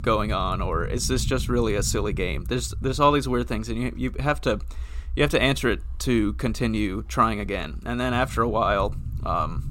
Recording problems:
low rumble; faint; throughout; 25 dB below the speech

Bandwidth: 16 kHz